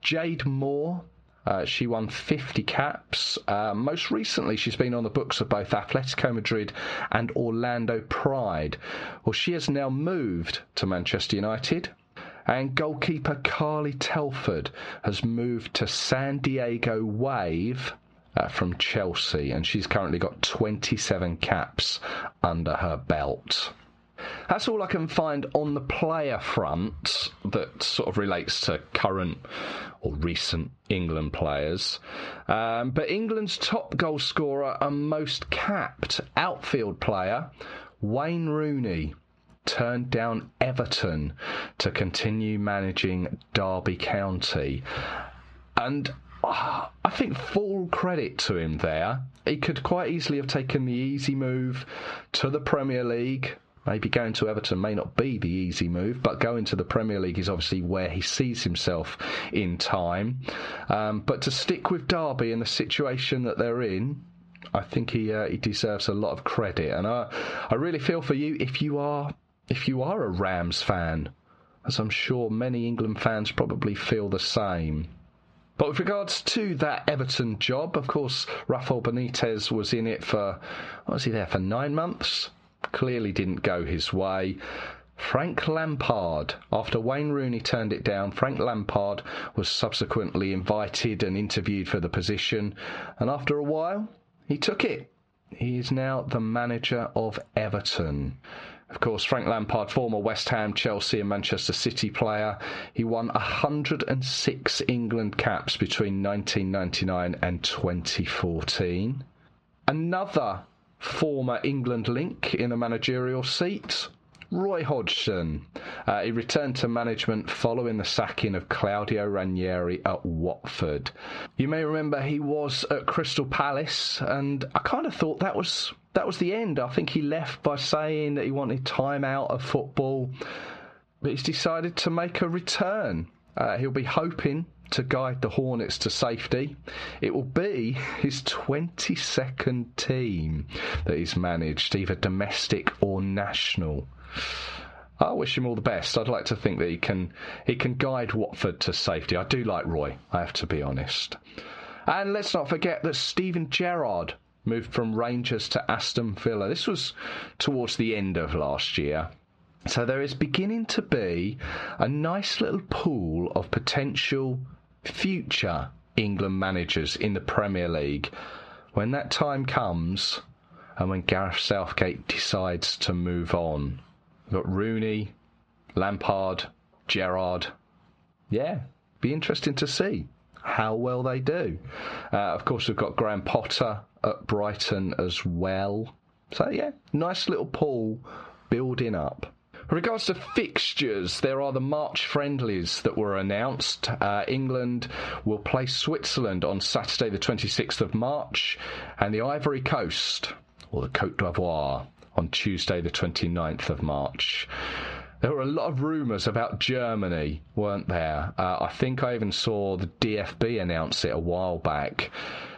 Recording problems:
squashed, flat; heavily
muffled; very slightly; fading above 4 kHz

